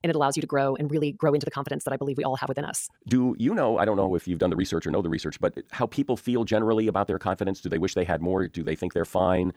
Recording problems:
wrong speed, natural pitch; too fast; 1.6 times normal speed

